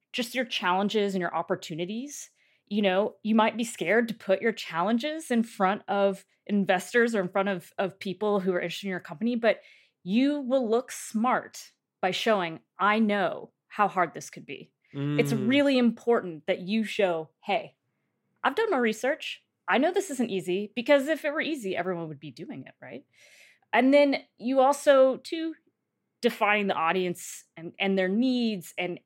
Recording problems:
none

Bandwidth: 16 kHz